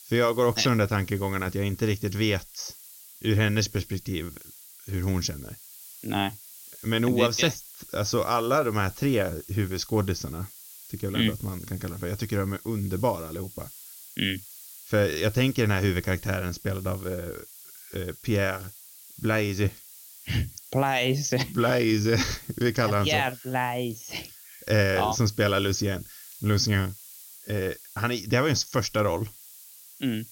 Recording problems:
high frequencies cut off; noticeable; nothing above 6.5 kHz
hiss; noticeable; throughout; 15 dB below the speech

